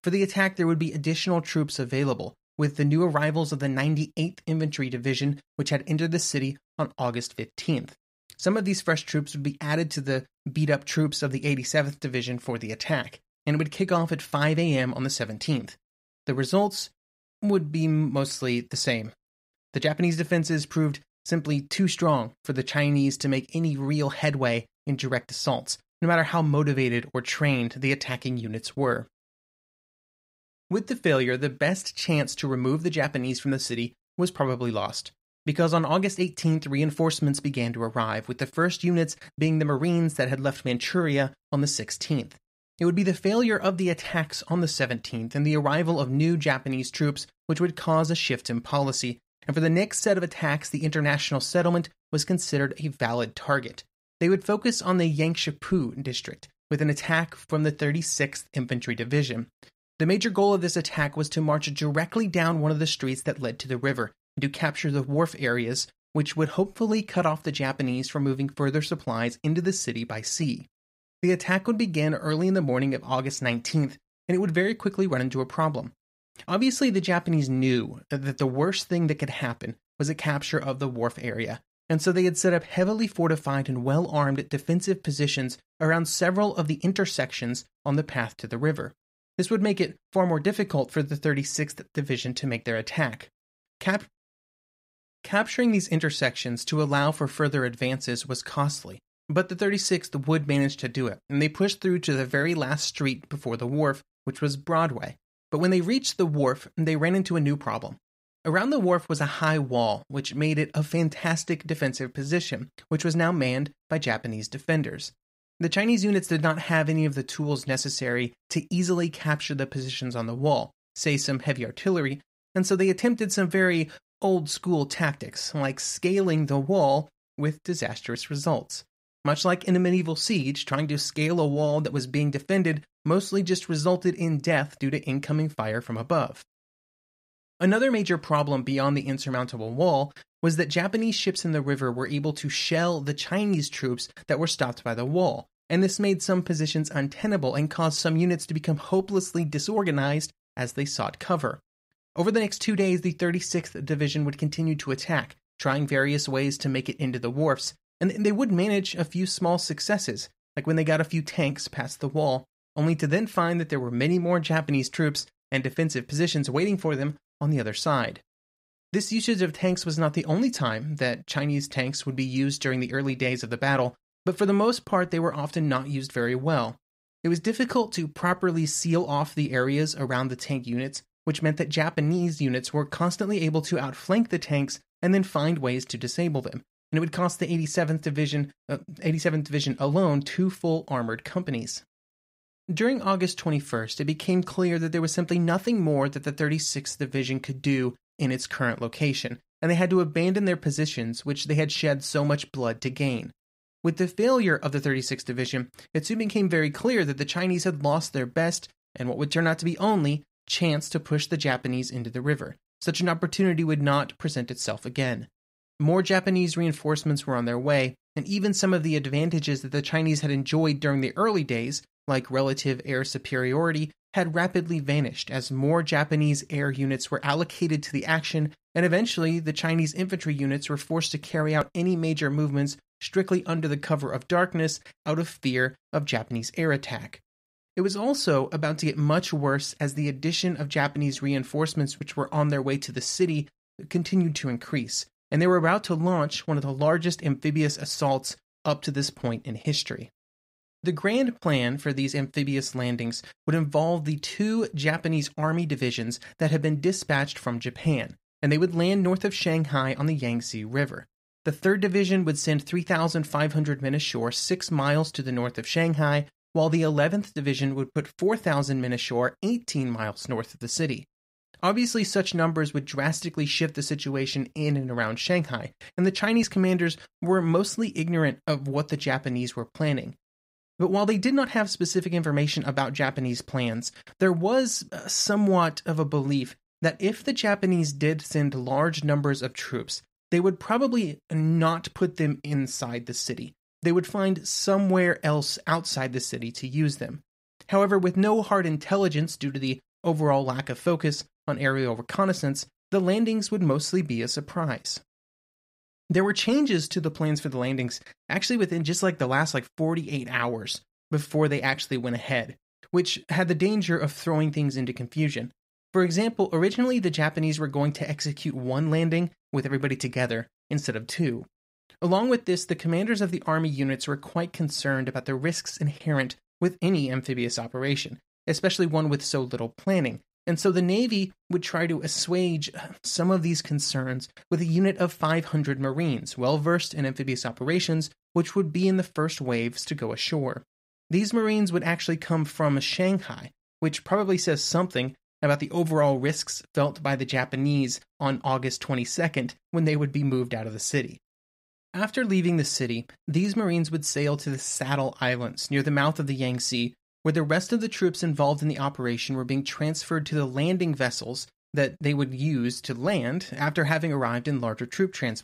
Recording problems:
none

